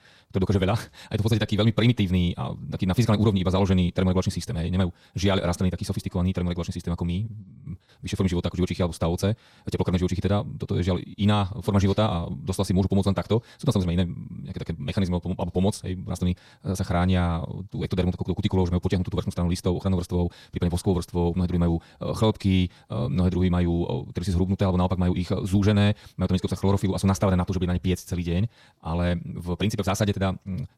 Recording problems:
wrong speed, natural pitch; too fast; 1.7 times normal speed

